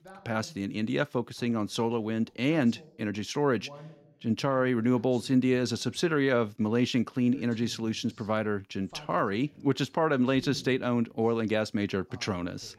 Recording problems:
voice in the background; faint; throughout; 25 dB below the speech

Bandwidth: 16 kHz